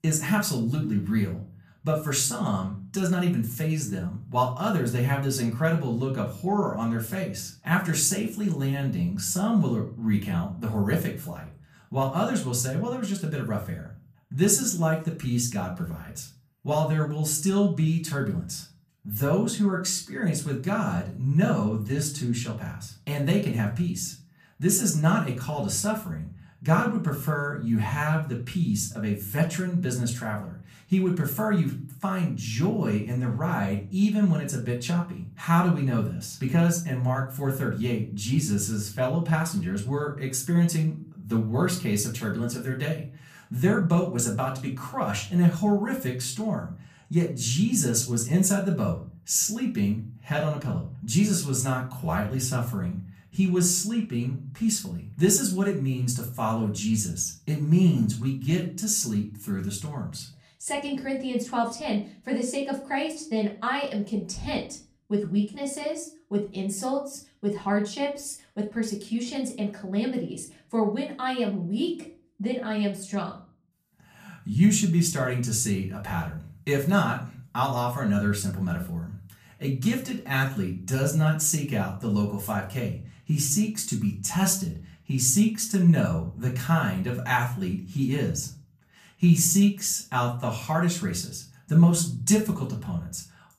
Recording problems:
off-mic speech; far
room echo; slight; dies away in 0.3 s

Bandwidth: 14.5 kHz